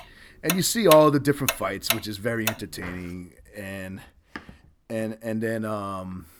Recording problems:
household noises; loud; throughout; 5 dB below the speech

